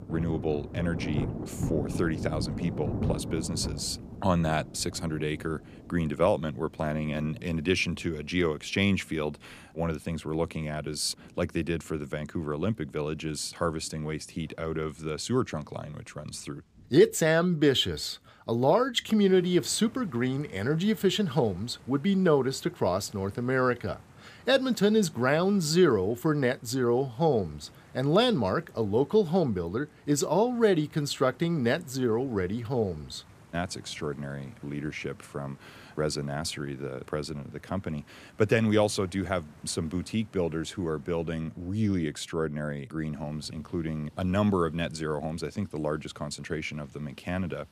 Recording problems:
rain or running water; noticeable; throughout; 10 dB below the speech

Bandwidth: 15 kHz